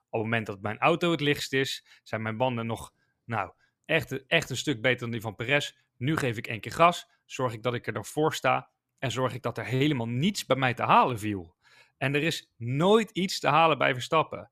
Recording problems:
none

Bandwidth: 14.5 kHz